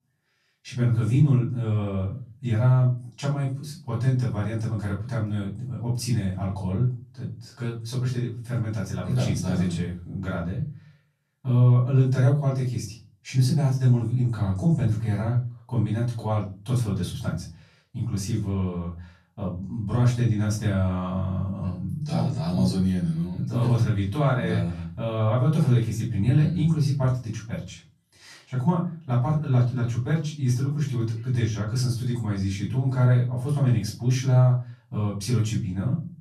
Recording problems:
off-mic speech; far
room echo; slight; dies away in 0.3 s

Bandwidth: 14 kHz